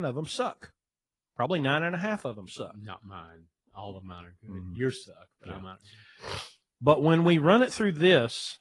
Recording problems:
garbled, watery; slightly; nothing above 10 kHz
abrupt cut into speech; at the start

